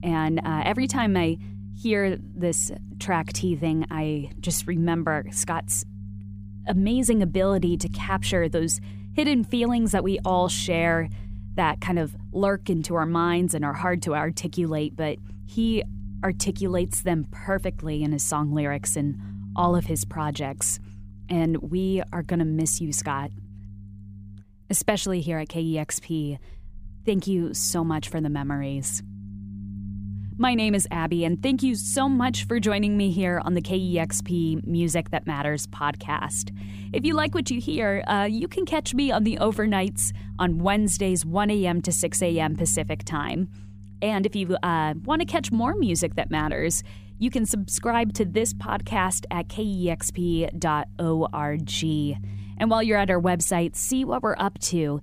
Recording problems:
low rumble; faint; throughout; 20 dB below the speech

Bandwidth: 15 kHz